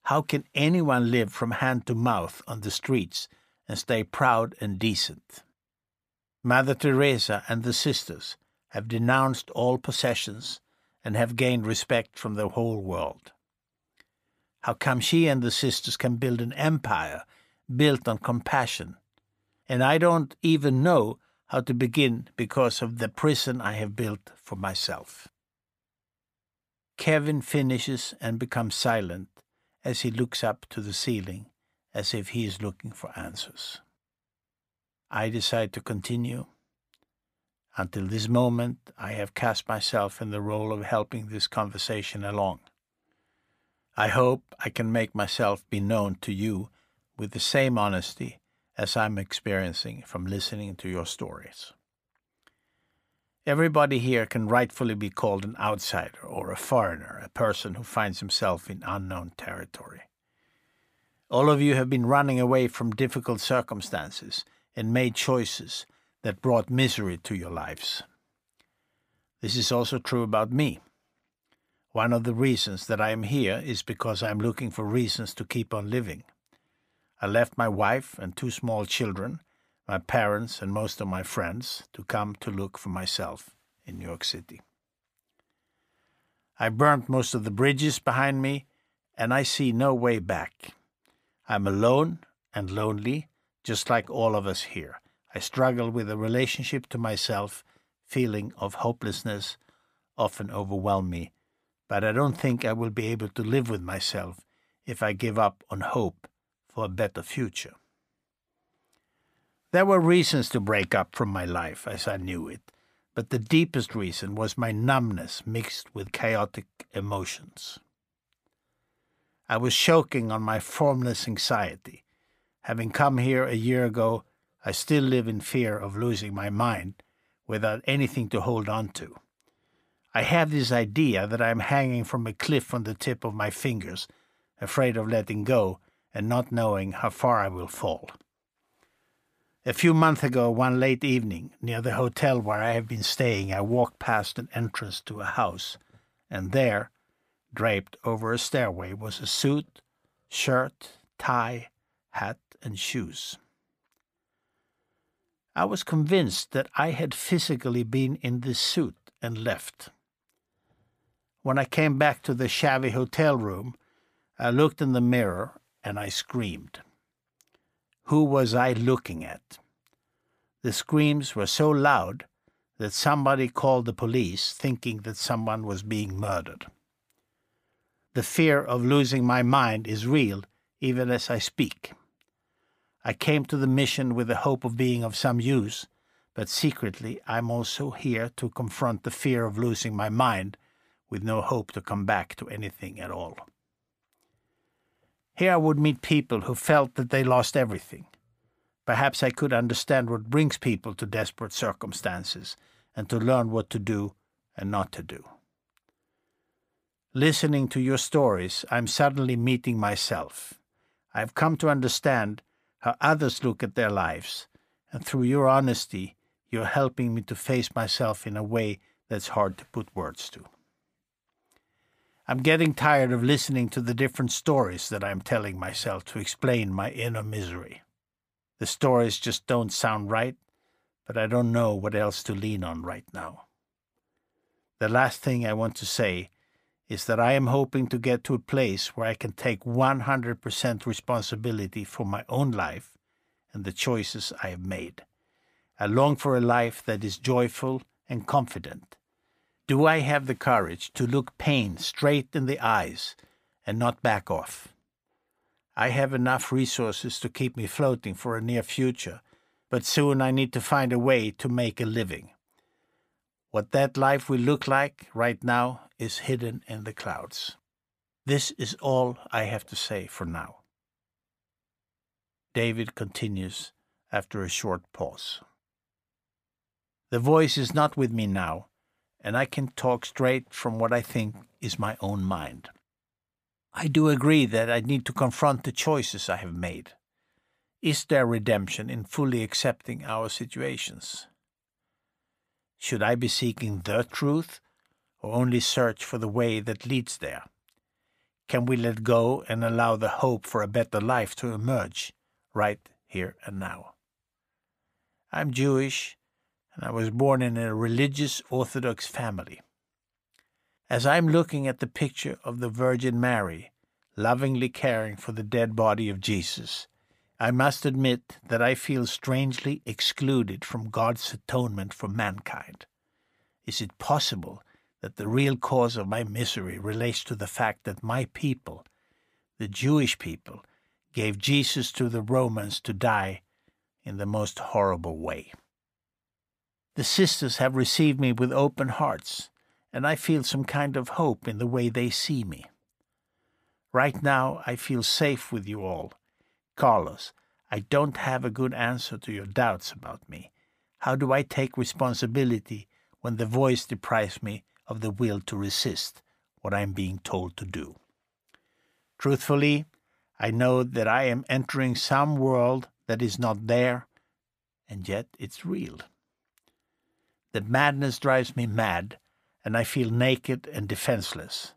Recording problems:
none

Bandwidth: 15 kHz